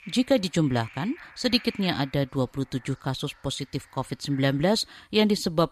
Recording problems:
animal sounds; faint; throughout; 20 dB below the speech

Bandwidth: 14 kHz